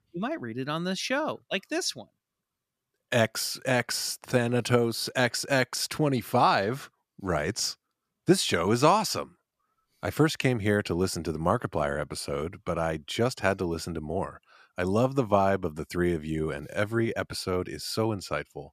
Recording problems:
none

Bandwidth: 14.5 kHz